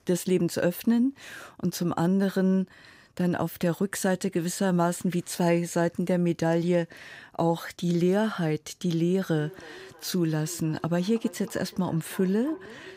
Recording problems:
echo of what is said; faint; from 9.5 s on; 320 ms later, 20 dB below the speech

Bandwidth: 15.5 kHz